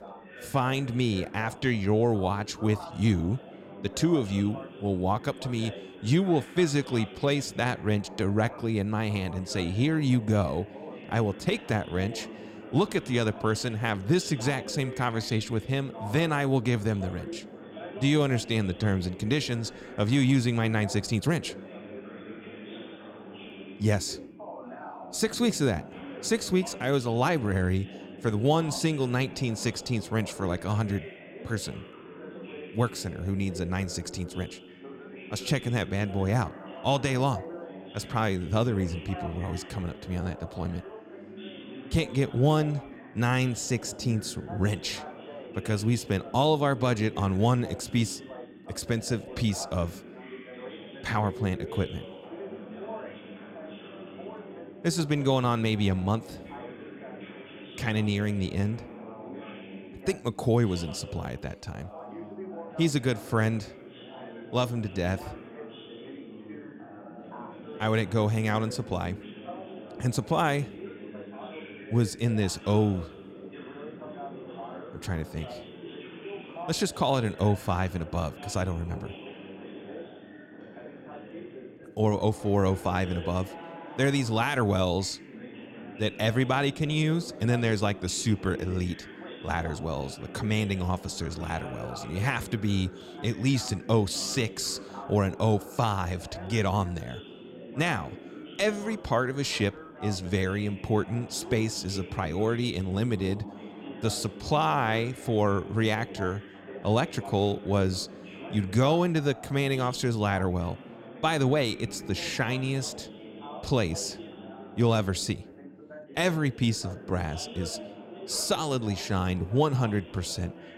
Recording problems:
background chatter; noticeable; throughout; 2 voices, 15 dB below the speech

